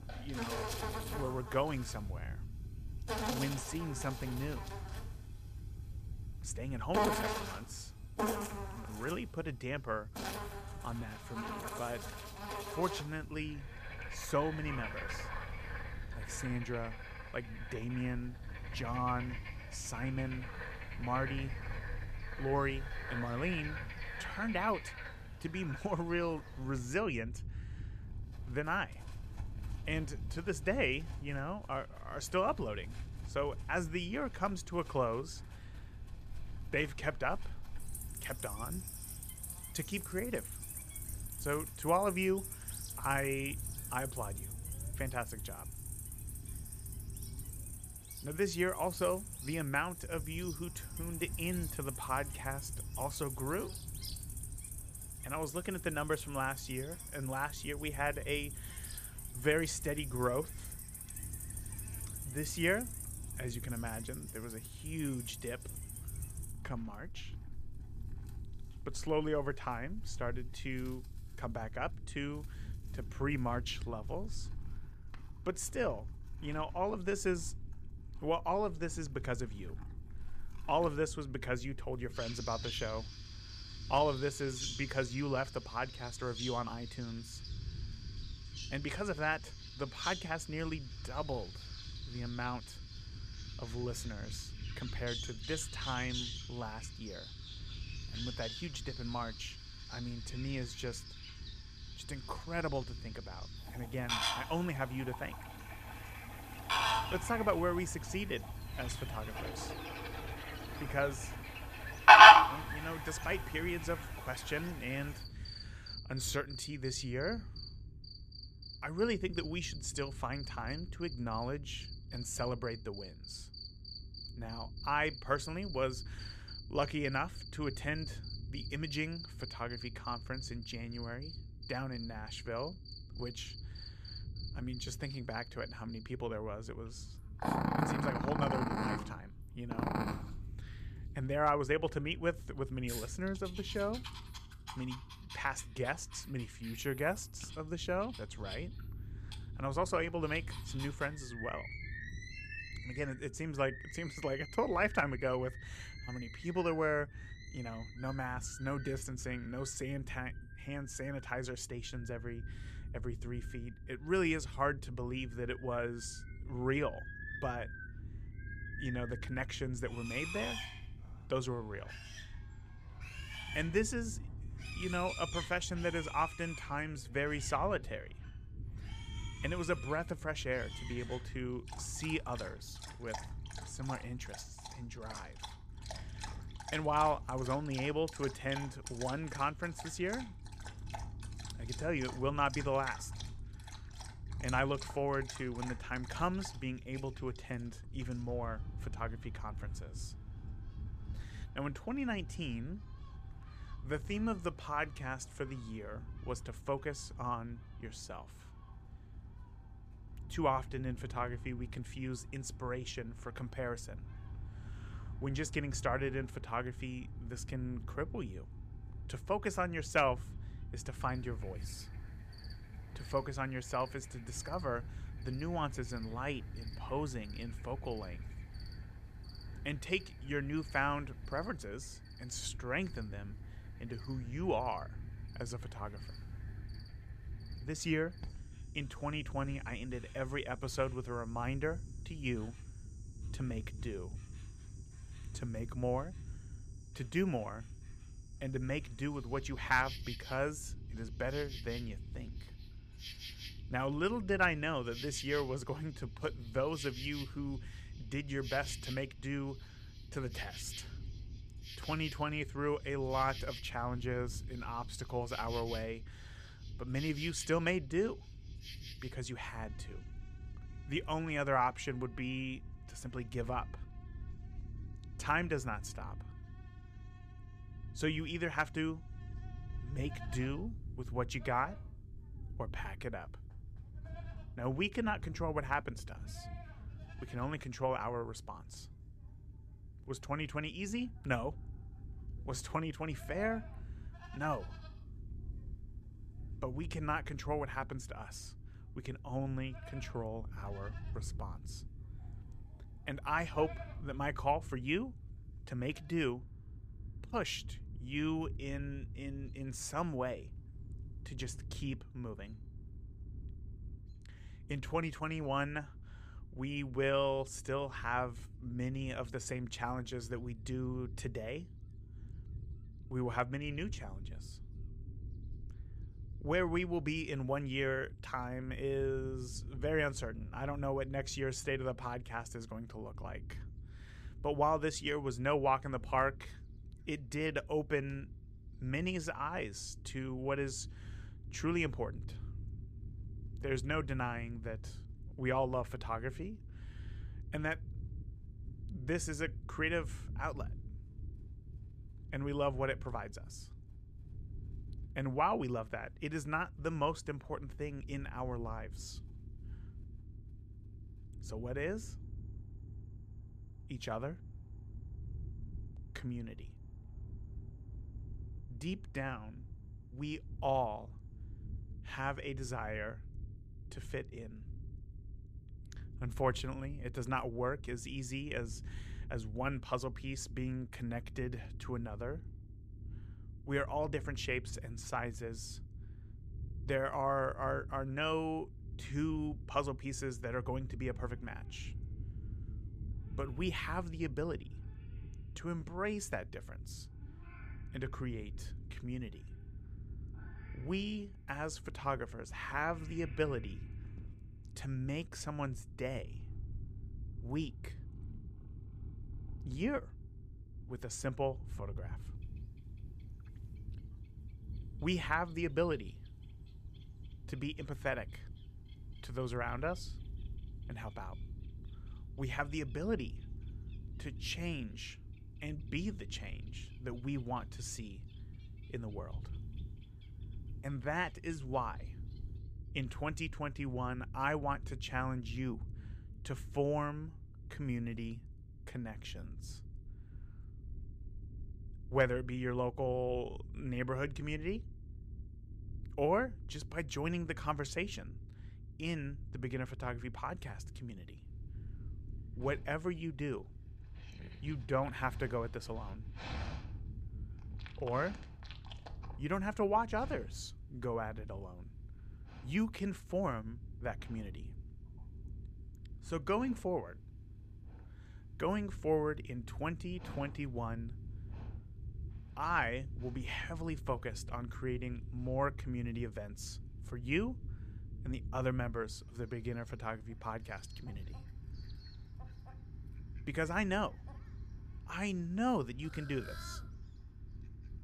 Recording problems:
animal sounds; very loud; throughout; as loud as the speech
low rumble; faint; throughout; 25 dB below the speech

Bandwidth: 14.5 kHz